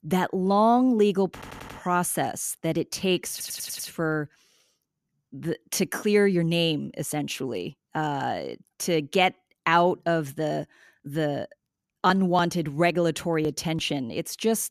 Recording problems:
audio stuttering; at 1.5 s and at 3.5 s

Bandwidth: 14.5 kHz